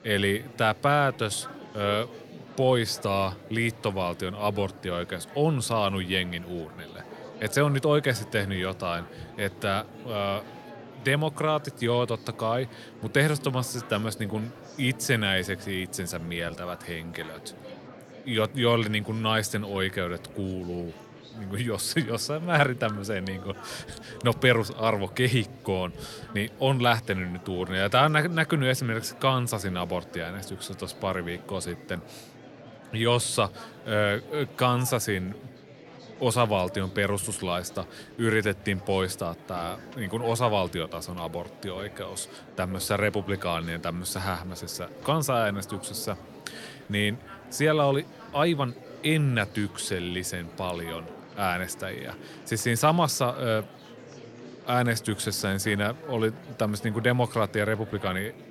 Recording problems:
murmuring crowd; noticeable; throughout; 20 dB below the speech

